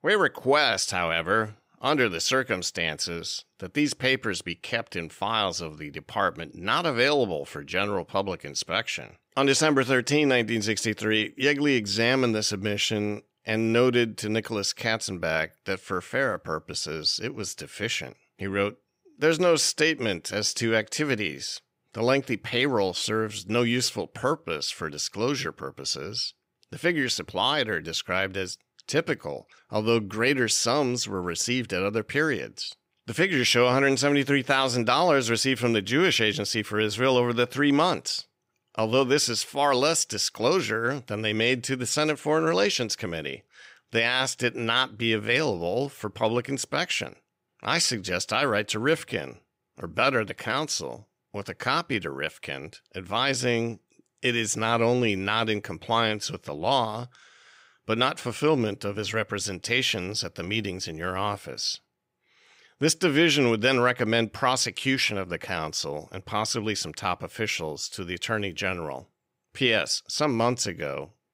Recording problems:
none

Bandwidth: 15.5 kHz